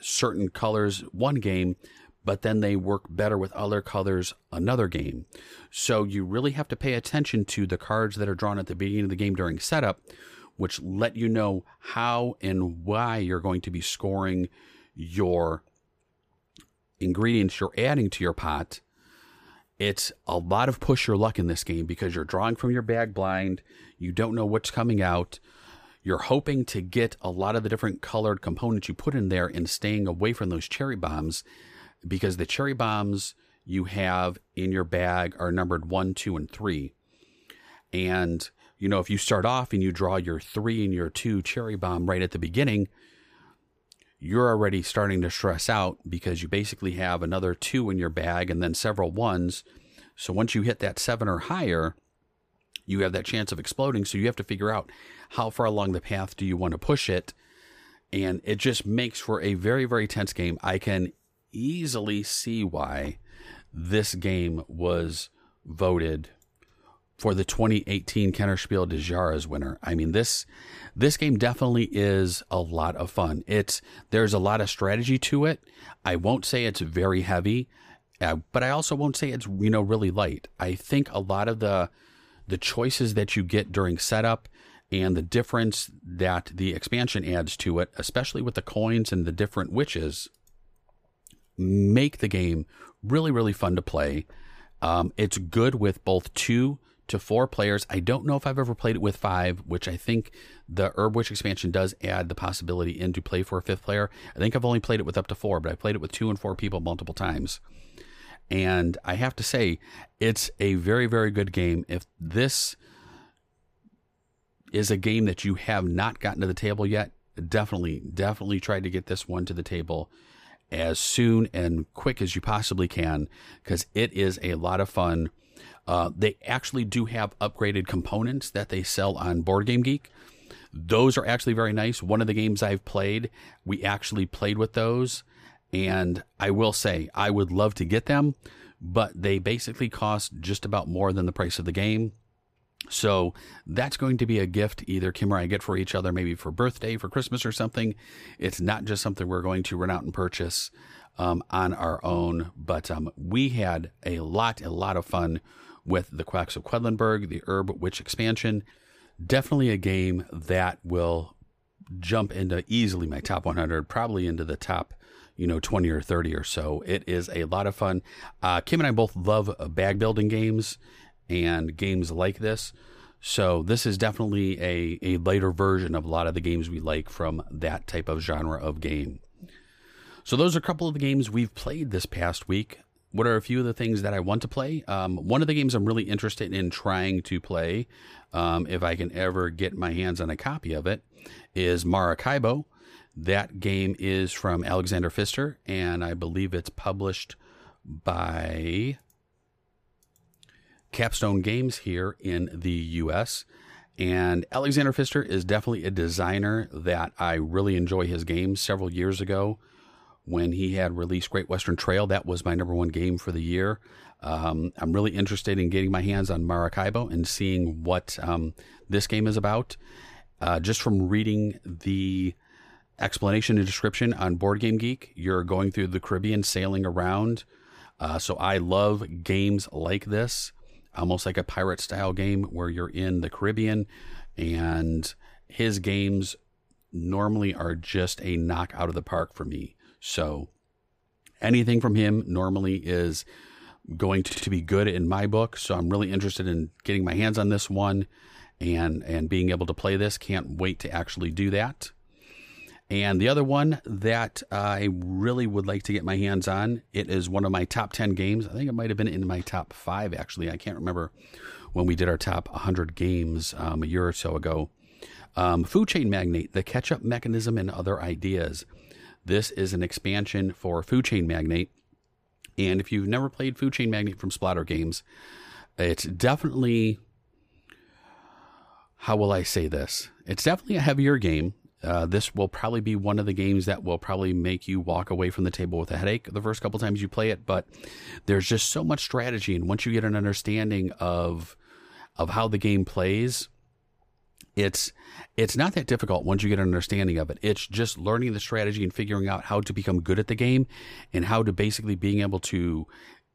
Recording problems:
audio stuttering; at 4:04

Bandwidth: 15 kHz